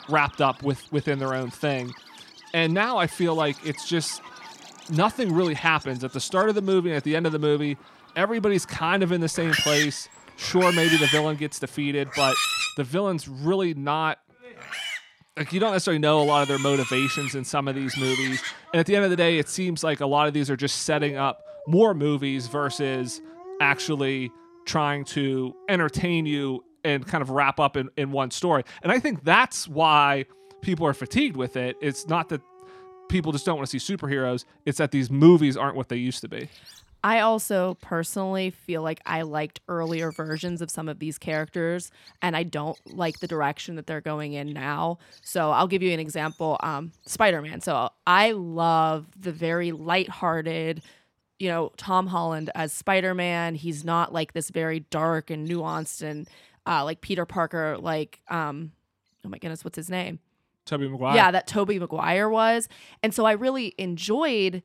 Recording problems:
animal sounds; loud; throughout; 6 dB below the speech

